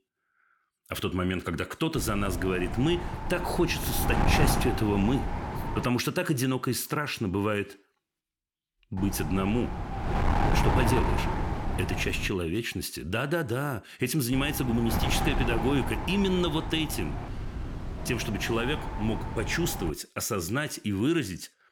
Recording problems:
wind noise on the microphone; heavy; from 2 to 6 s, from 9 to 12 s and from 14 to 20 s; 3 dB below the speech

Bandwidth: 17.5 kHz